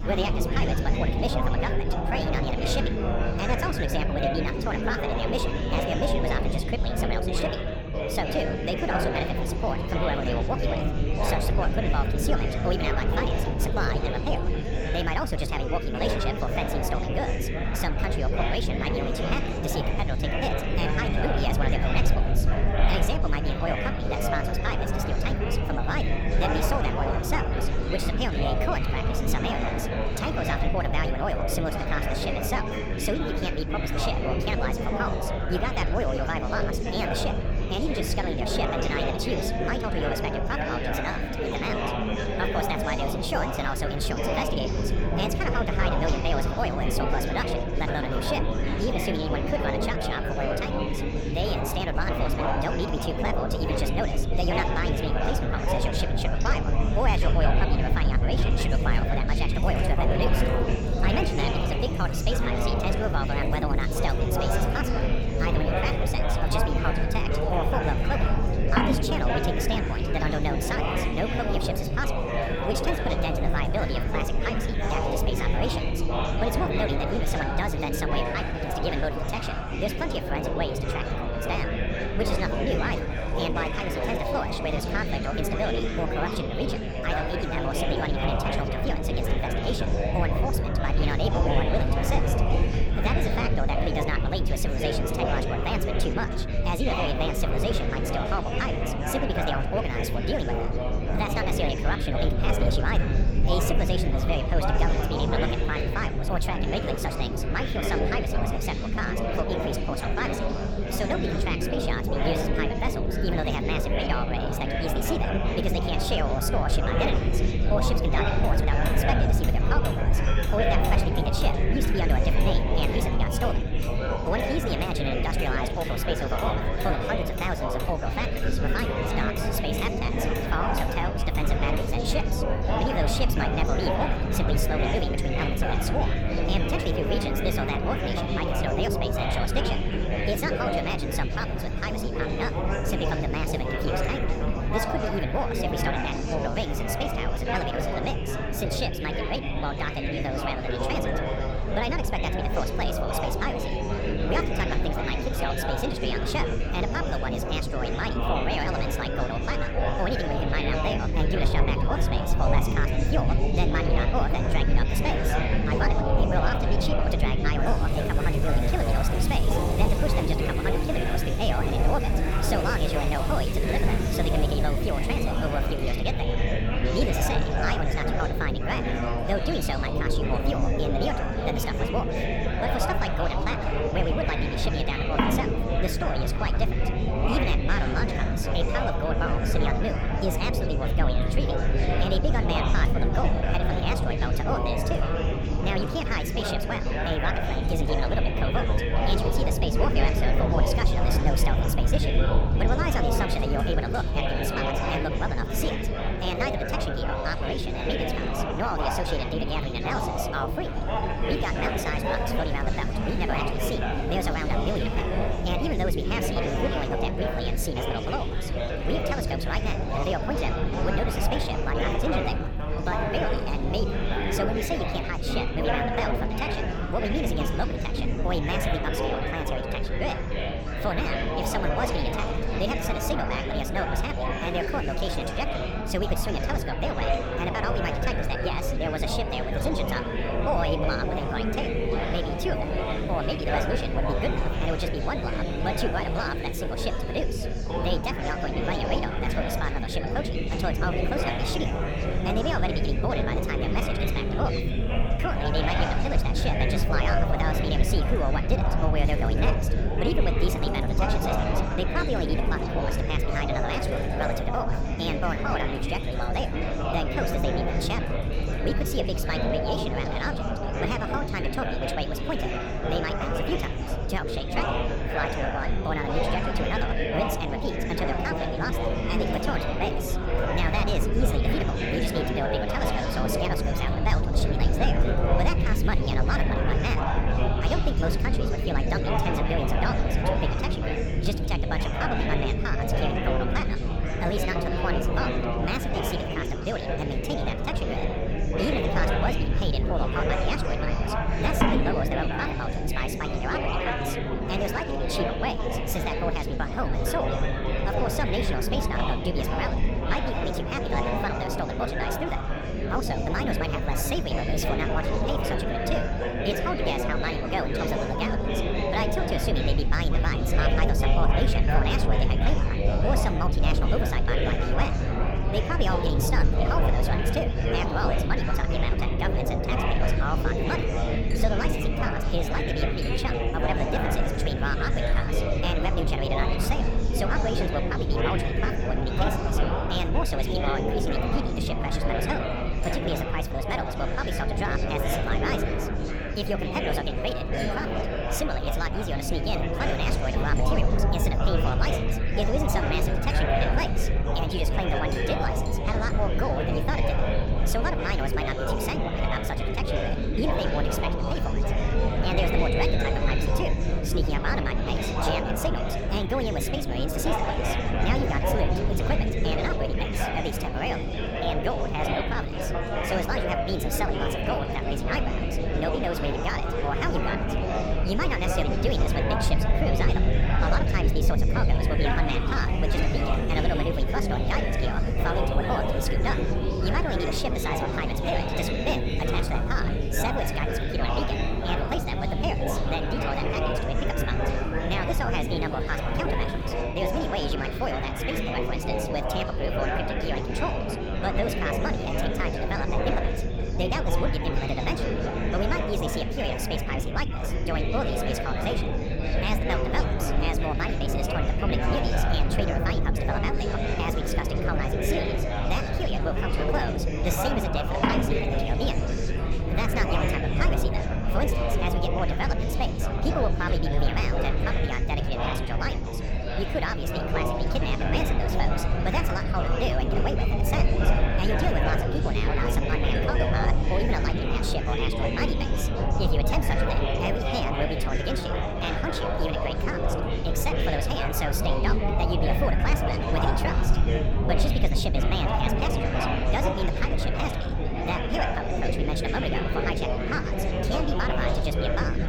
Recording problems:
wrong speed and pitch; too fast and too high; 1.5 times normal speed
chatter from many people; very loud; throughout; 1 dB above the speech
household noises; noticeable; throughout; 15 dB below the speech
low rumble; noticeable; throughout; 15 dB below the speech

